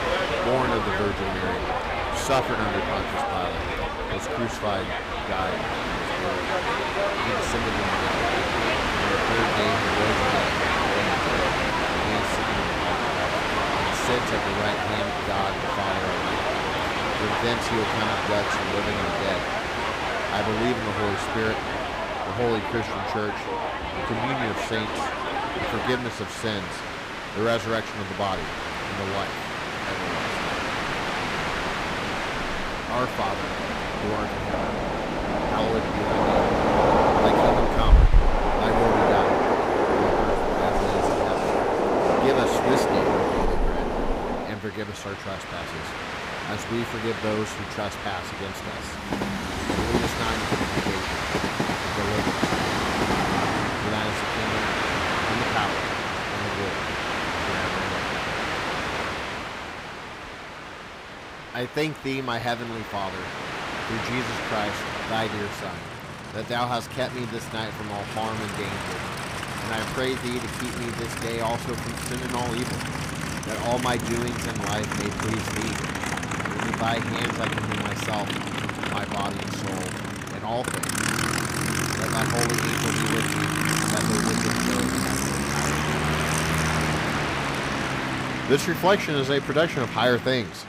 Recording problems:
train or aircraft noise; very loud; throughout; 5 dB above the speech

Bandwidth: 15.5 kHz